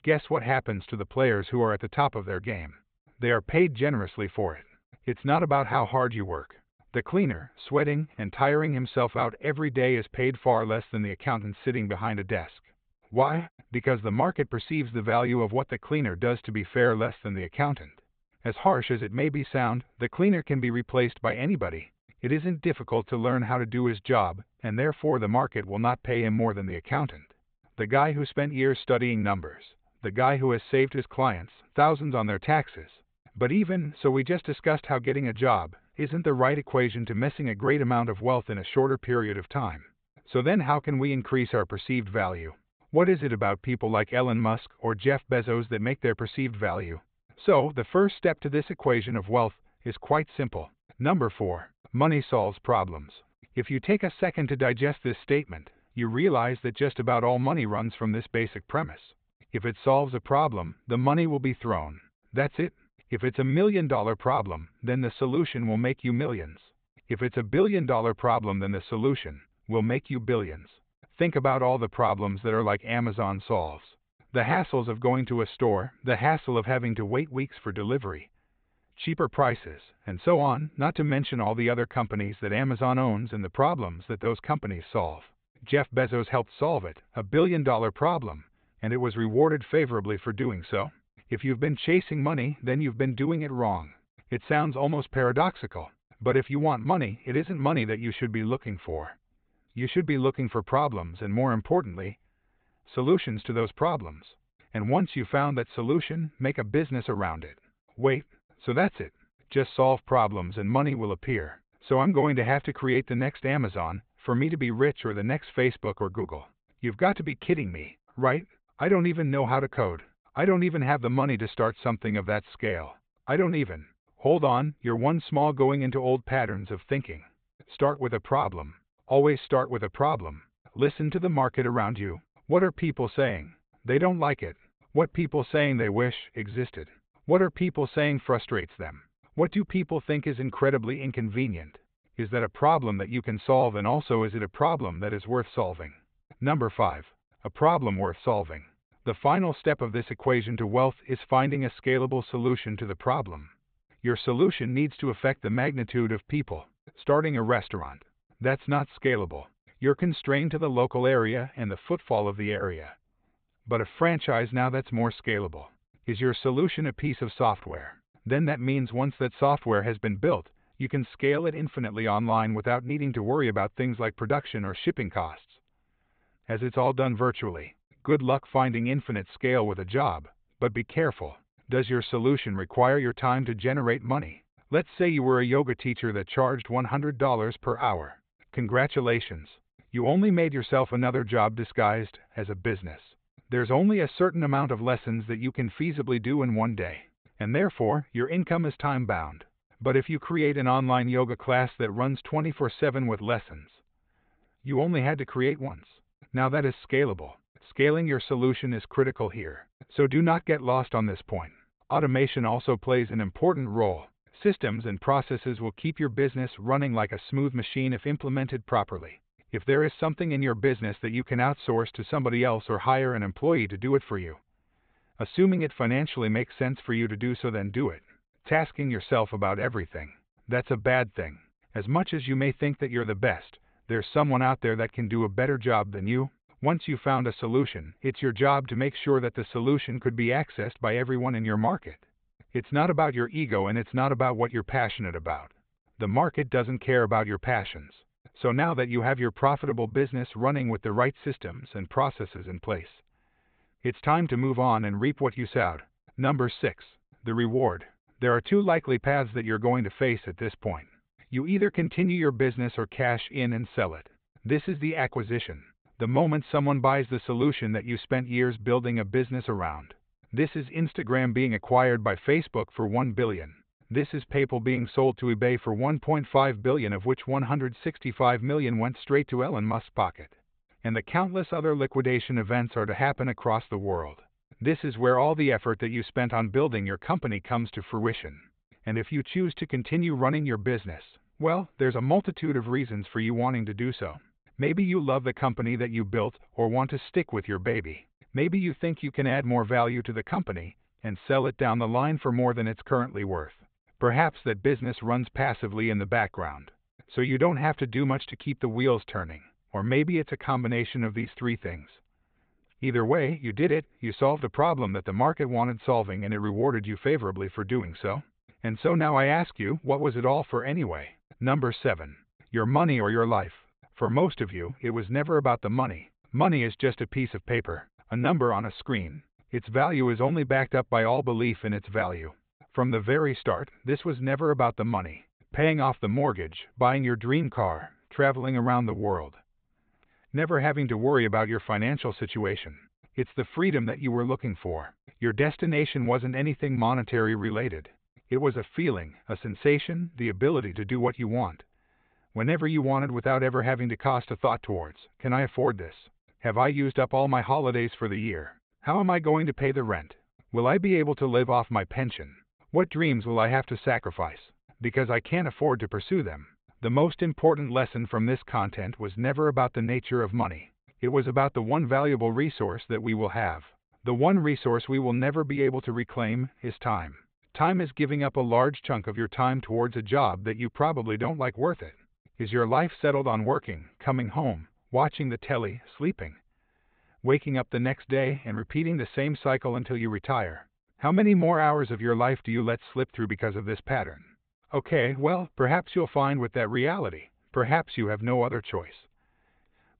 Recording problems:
high frequencies cut off; severe; nothing above 4 kHz

